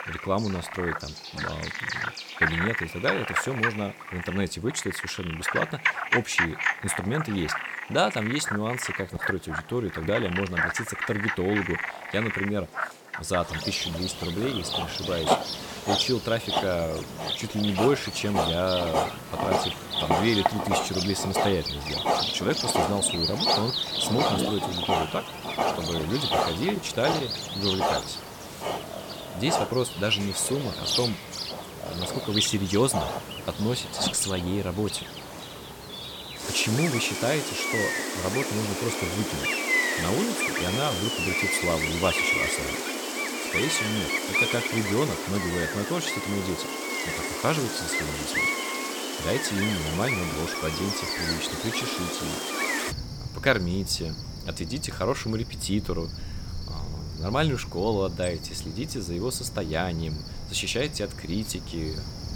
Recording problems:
animal sounds; very loud; throughout; as loud as the speech

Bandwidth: 17 kHz